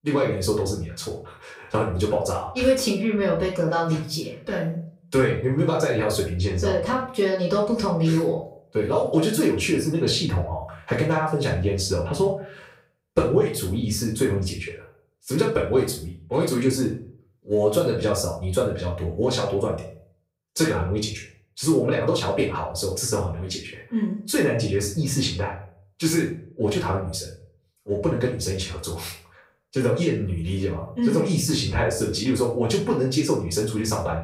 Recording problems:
off-mic speech; far
room echo; slight; dies away in 0.4 s

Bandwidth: 15.5 kHz